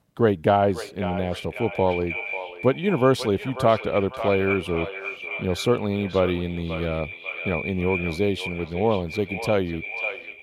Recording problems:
echo of what is said; strong; throughout; 540 ms later, 8 dB below the speech

